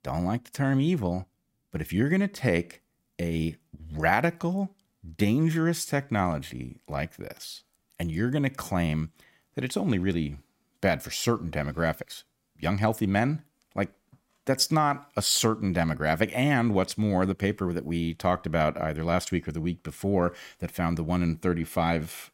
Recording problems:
none

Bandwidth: 16 kHz